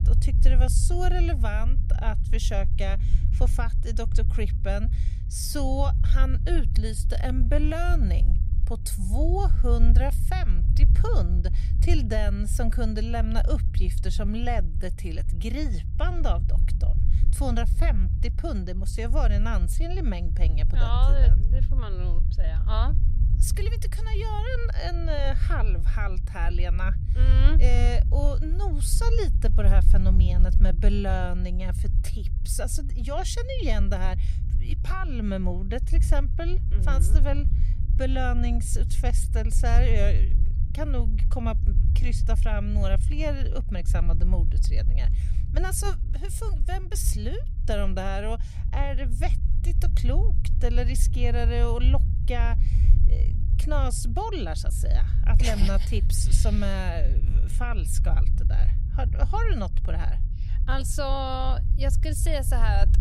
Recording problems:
low rumble; noticeable; throughout; 10 dB below the speech

